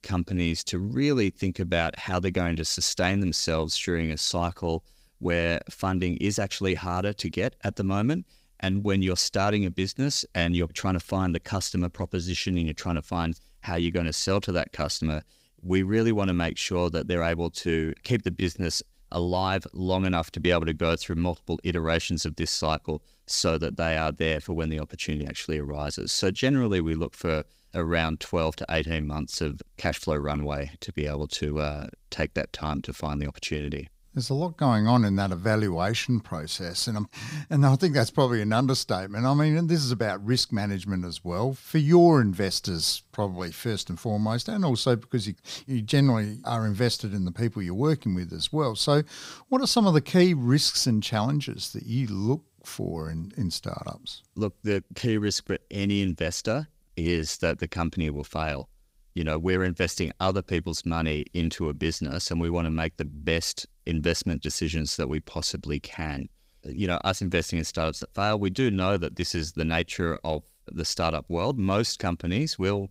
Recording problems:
none

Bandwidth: 15.5 kHz